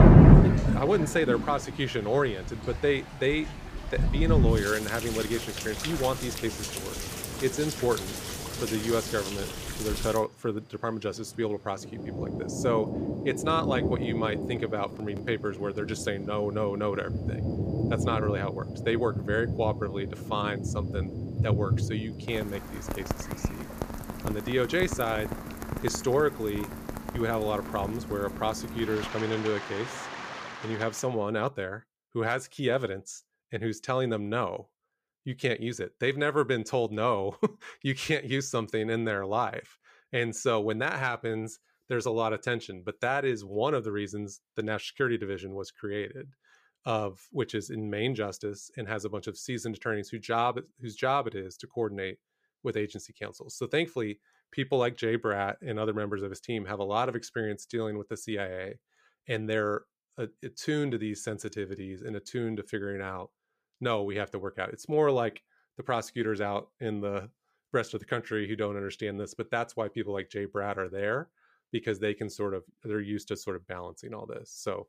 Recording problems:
rain or running water; very loud; until 31 s; 1 dB above the speech

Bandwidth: 15 kHz